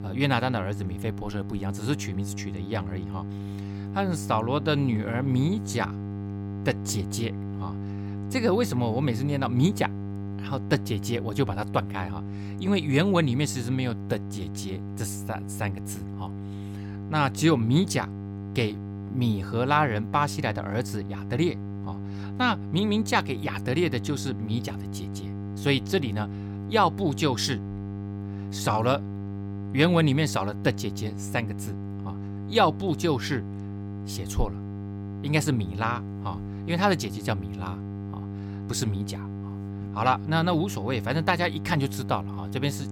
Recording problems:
electrical hum; noticeable; throughout; 50 Hz, 15 dB below the speech

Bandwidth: 17 kHz